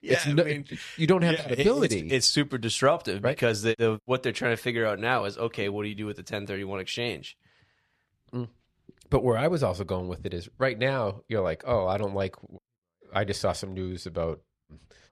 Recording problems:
none

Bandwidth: 13.5 kHz